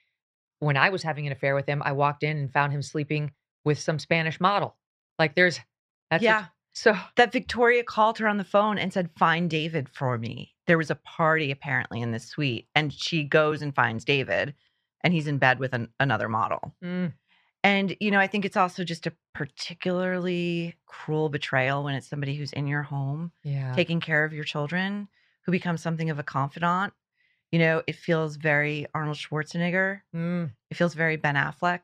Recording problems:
muffled; slightly; fading above 3 kHz

